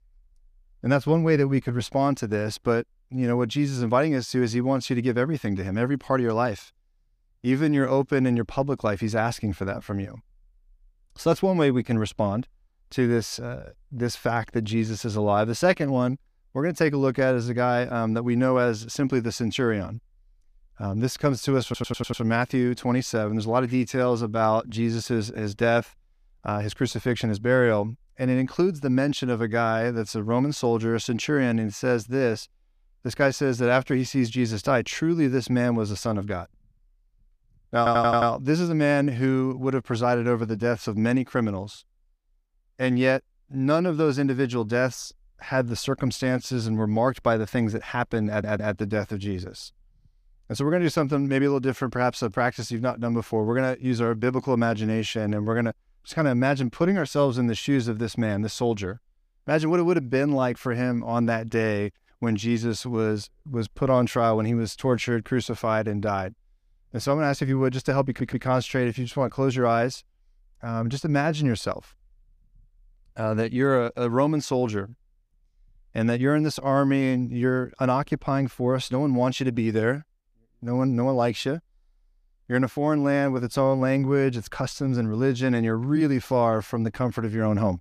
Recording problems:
audio stuttering; 4 times, first at 22 s

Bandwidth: 15 kHz